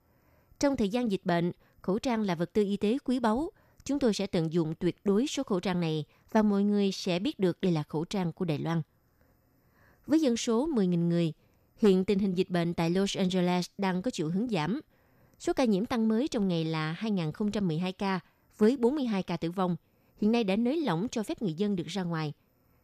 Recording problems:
none

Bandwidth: 14.5 kHz